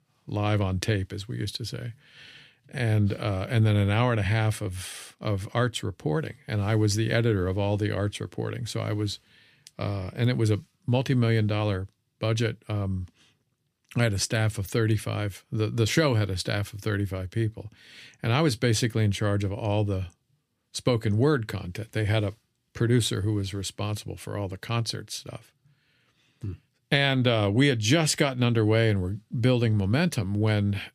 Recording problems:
none

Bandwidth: 15 kHz